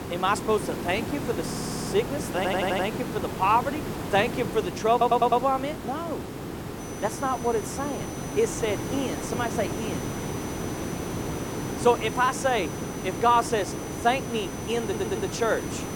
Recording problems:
hiss; loud; throughout; 6 dB below the speech
high-pitched whine; noticeable; from 7 s on; 6 kHz, 15 dB below the speech
audio stuttering; 4 times, first at 1.5 s

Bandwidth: 17 kHz